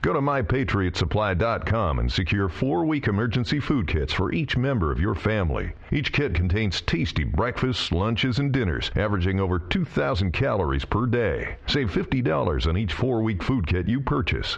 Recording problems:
squashed, flat; heavily
muffled; very slightly; fading above 3.5 kHz

